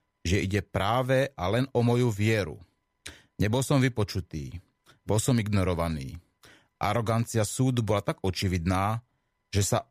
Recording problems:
none

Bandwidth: 15 kHz